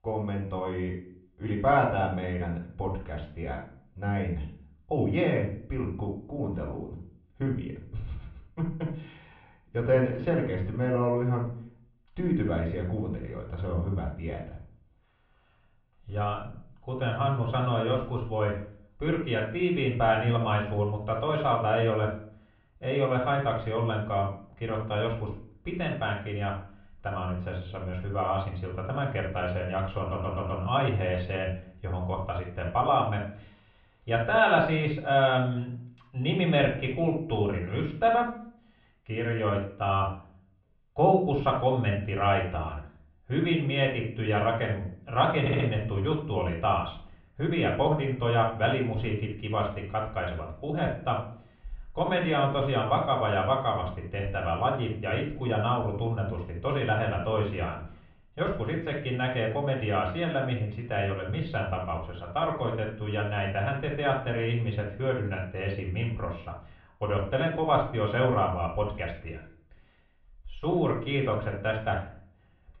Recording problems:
off-mic speech; far
room echo; slight; dies away in 0.4 s
muffled; very slightly; fading above 3.5 kHz
audio stuttering; at 30 s and at 45 s

